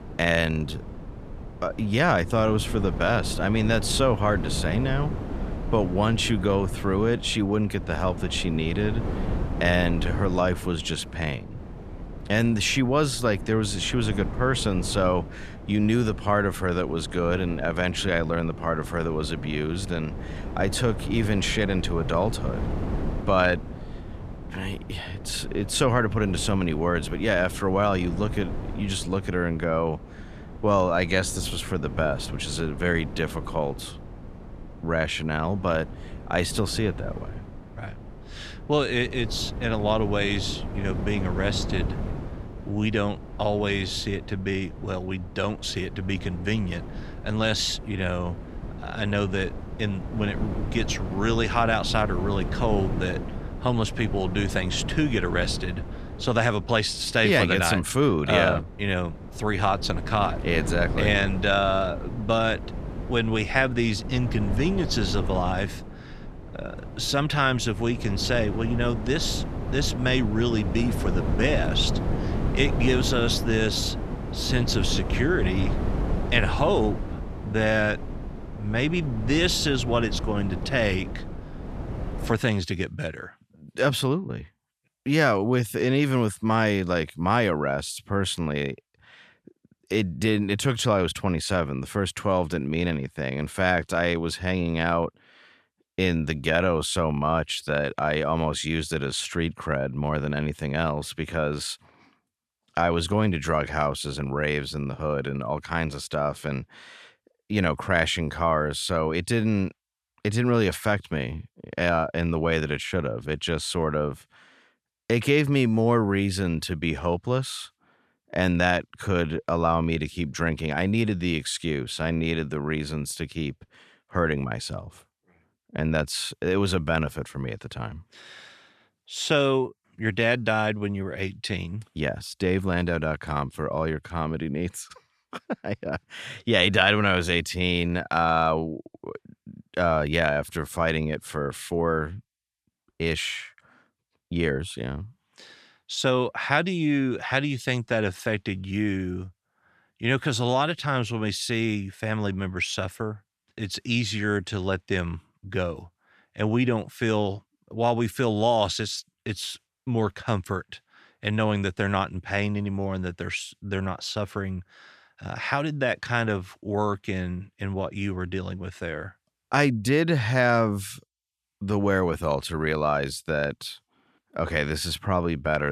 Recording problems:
wind noise on the microphone; occasional gusts; until 1:22; 15 dB below the speech
abrupt cut into speech; at the end

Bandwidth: 14 kHz